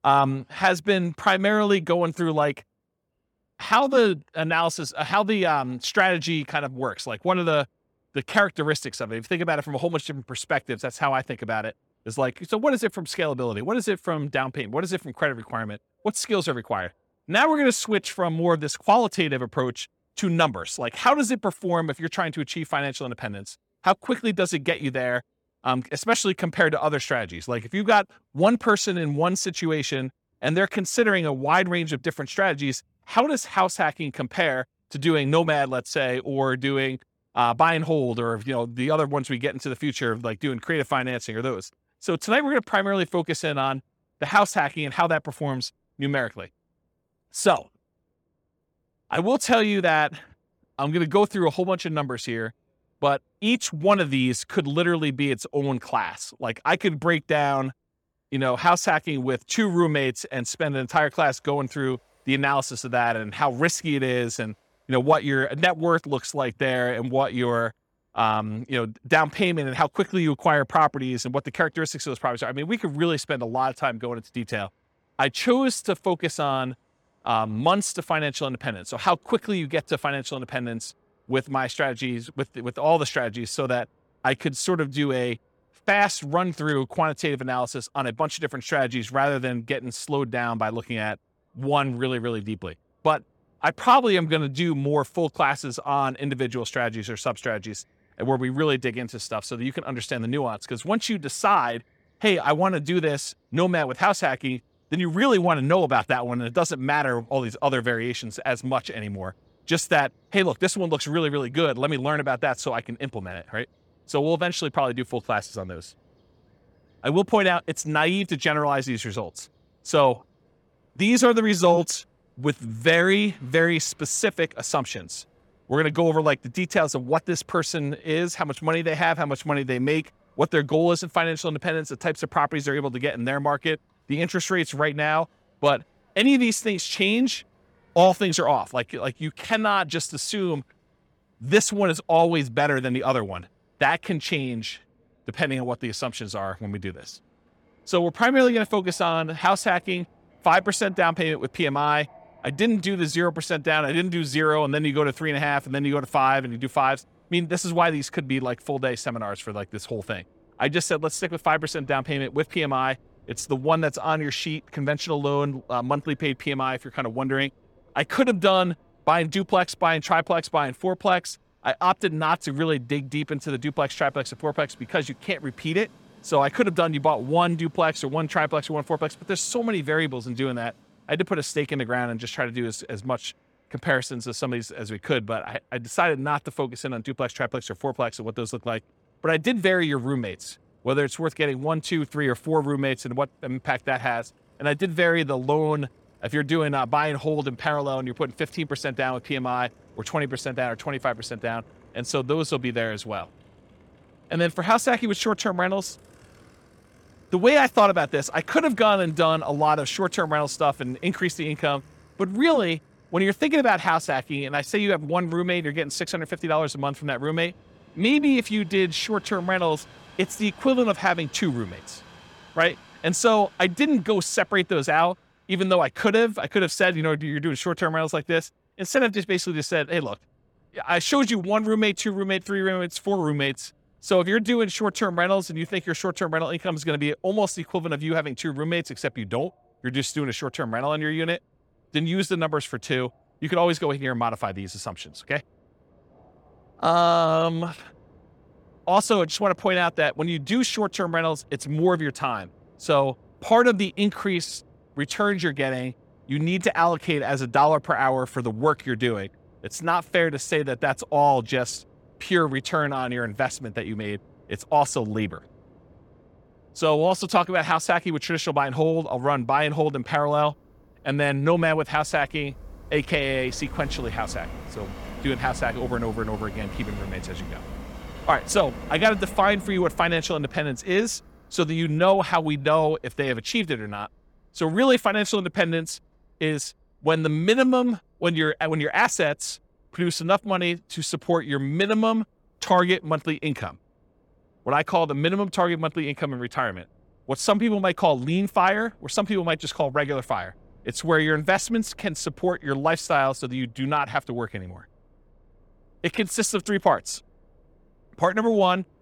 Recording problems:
train or aircraft noise; faint; throughout; 25 dB below the speech

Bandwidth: 18 kHz